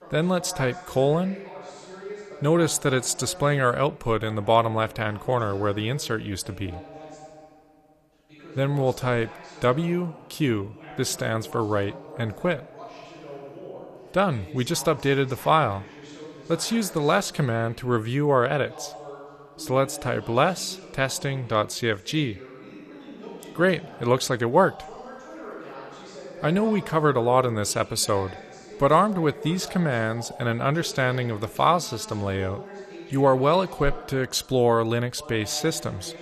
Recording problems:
voice in the background; noticeable; throughout; 15 dB below the speech

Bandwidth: 13.5 kHz